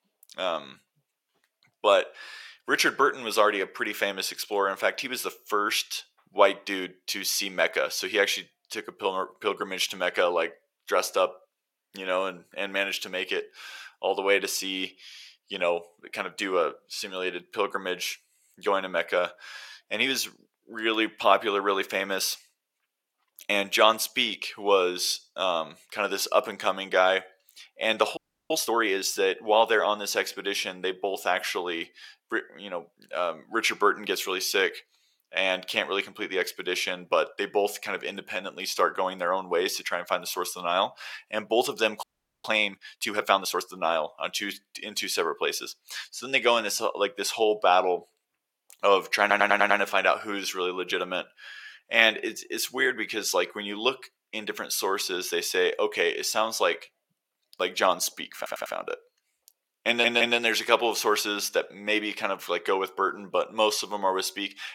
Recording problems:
thin; somewhat; fading below 550 Hz
audio freezing; at 28 s and at 42 s
audio stuttering; at 49 s, at 58 s and at 1:00

